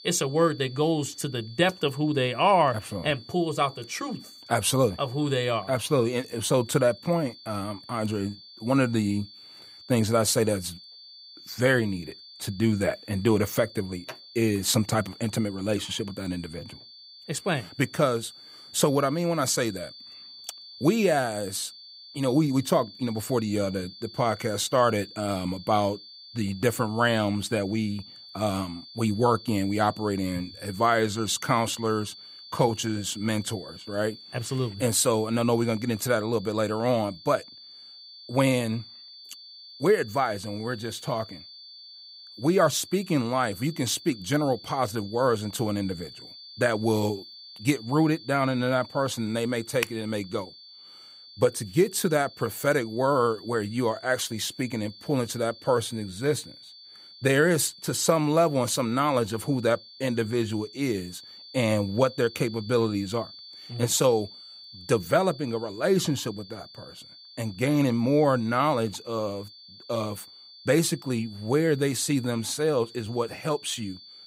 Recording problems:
high-pitched whine; noticeable; throughout; 4.5 kHz, 20 dB below the speech

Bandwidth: 15.5 kHz